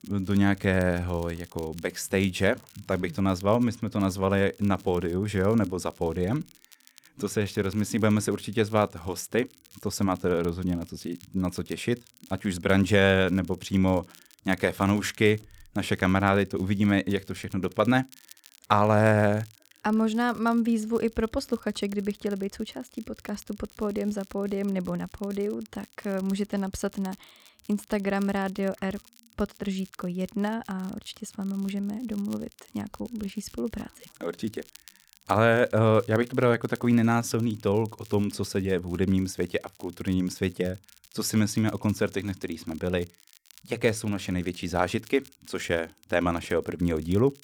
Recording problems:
crackle, like an old record; faint; 25 dB below the speech

